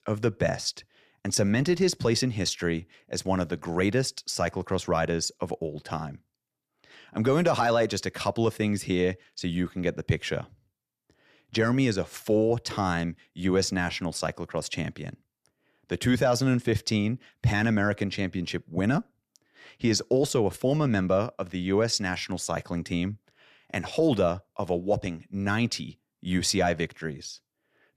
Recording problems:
none

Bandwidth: 14 kHz